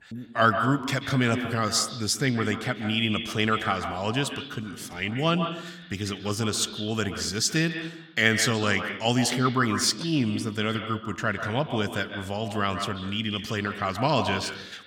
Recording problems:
echo of what is said; strong; throughout; 130 ms later, 8 dB below the speech

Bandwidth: 17.5 kHz